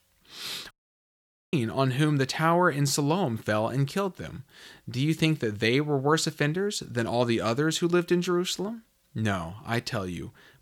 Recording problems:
audio cutting out; at 0.5 s for 1 s

